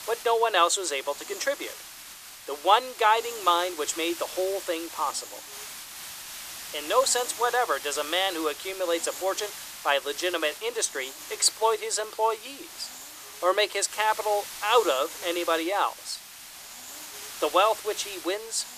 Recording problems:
thin; very; fading below 350 Hz
hiss; noticeable; throughout; 10 dB below the speech

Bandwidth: 14.5 kHz